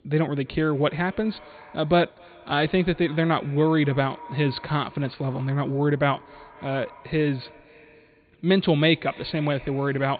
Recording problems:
high frequencies cut off; severe; nothing above 4.5 kHz
echo of what is said; faint; throughout; 260 ms later, 20 dB below the speech

